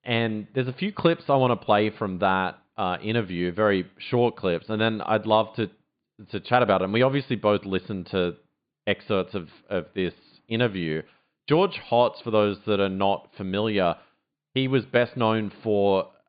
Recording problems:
high frequencies cut off; severe; nothing above 4.5 kHz

